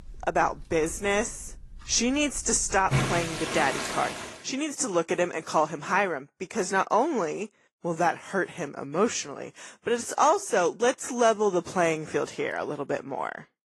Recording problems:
garbled, watery; slightly
household noises; loud; until 4 s; 4 dB below the speech

